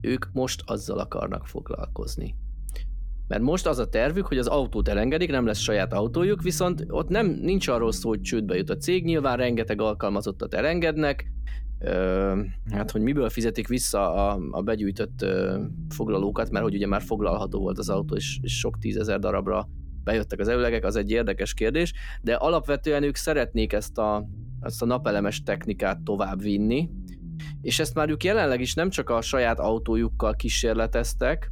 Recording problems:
low rumble; faint; throughout; 25 dB below the speech

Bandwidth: 17.5 kHz